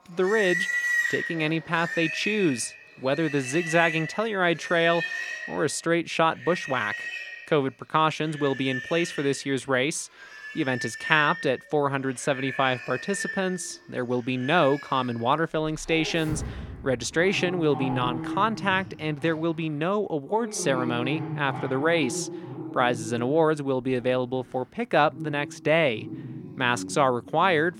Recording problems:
animal sounds; loud; throughout; 7 dB below the speech

